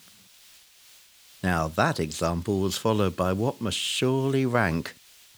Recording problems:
hiss; faint; throughout; 25 dB below the speech

